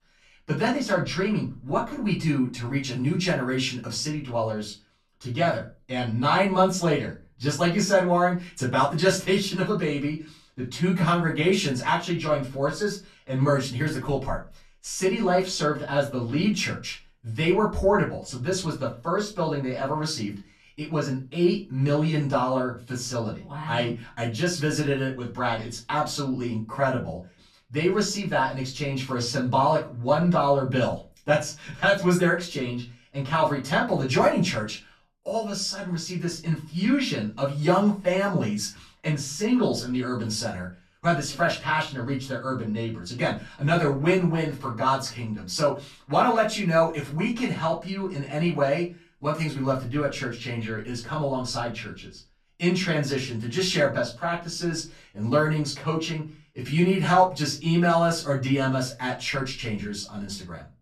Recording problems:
off-mic speech; far
room echo; slight; dies away in 0.3 s

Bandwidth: 13.5 kHz